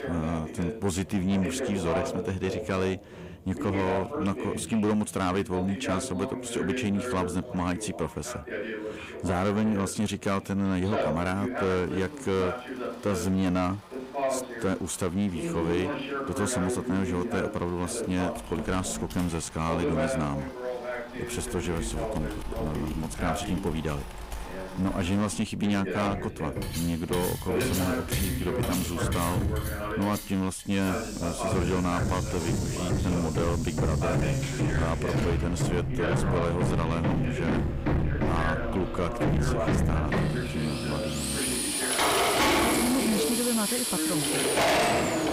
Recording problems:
distortion; heavy; 7 dB below the speech
machinery noise; very loud; throughout; as loud as the speech
household noises; loud; from 18 s on; 3 dB below the speech
voice in the background; loud; throughout; 4 dB below the speech

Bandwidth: 15.5 kHz